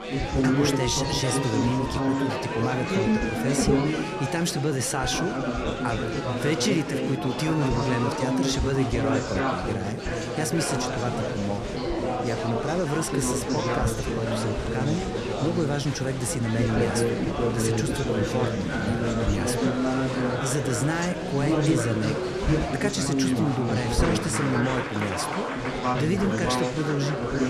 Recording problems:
chatter from many people; very loud; throughout; 2 dB above the speech

